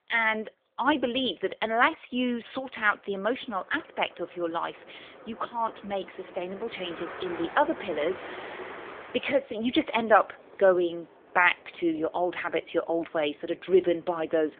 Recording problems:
phone-call audio; nothing above 3.5 kHz
traffic noise; noticeable; throughout; 15 dB below the speech

